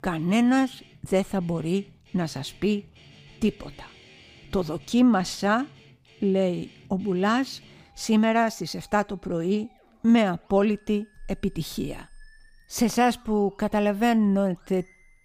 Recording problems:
background music; faint; throughout; 30 dB below the speech

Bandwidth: 15 kHz